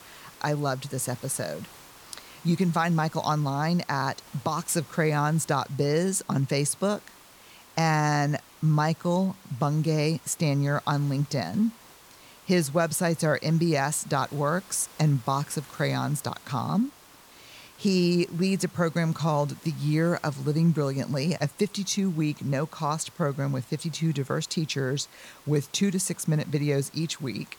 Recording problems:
hiss; faint; throughout; 25 dB below the speech

